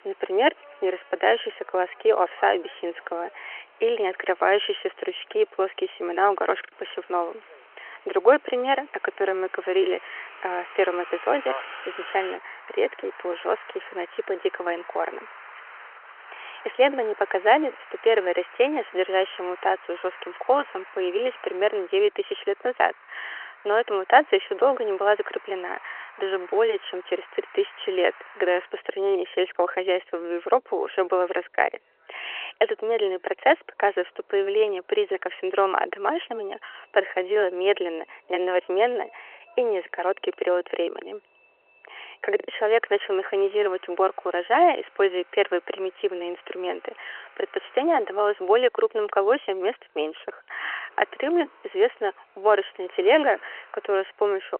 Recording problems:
phone-call audio; nothing above 3 kHz
traffic noise; noticeable; throughout; 20 dB below the speech
choppy; occasionally; at 6.5 s and at 42 s; 4% of the speech affected

